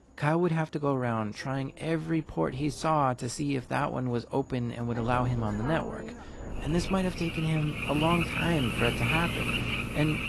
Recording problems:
garbled, watery; slightly; nothing above 11.5 kHz
animal sounds; loud; throughout; 3 dB below the speech
wind noise on the microphone; occasional gusts; from 1.5 to 4 s and from 5 to 8.5 s; 20 dB below the speech

